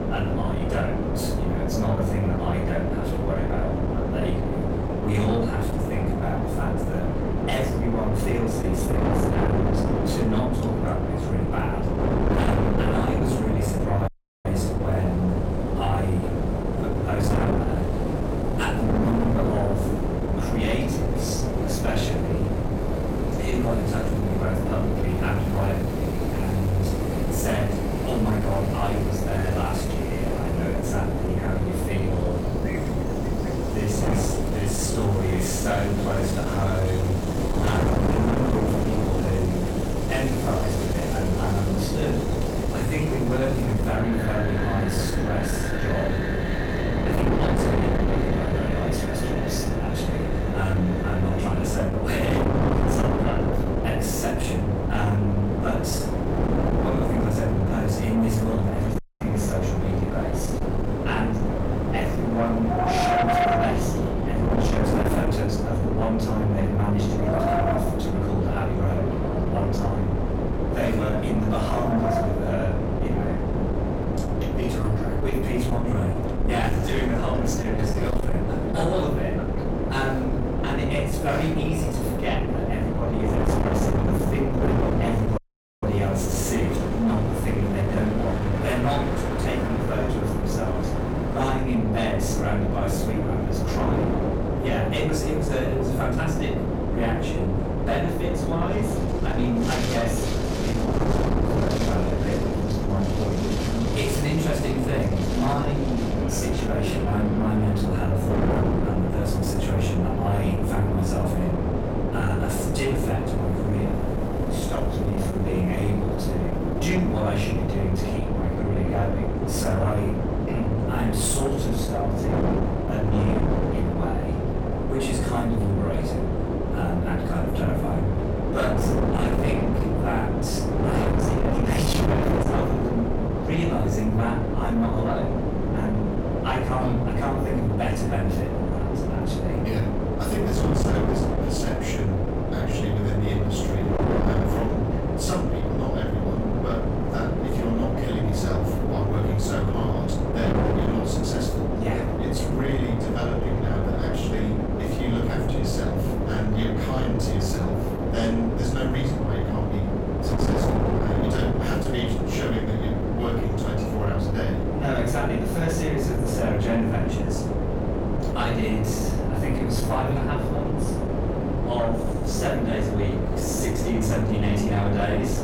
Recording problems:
off-mic speech; far
room echo; noticeable; dies away in 0.5 s
distortion; slight; 10 dB below the speech
wind noise on the microphone; heavy; 1 dB above the speech
wind in the background; loud; until 1:58; 9 dB below the speech
audio cutting out; at 14 s, at 59 s and at 1:25

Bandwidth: 17.5 kHz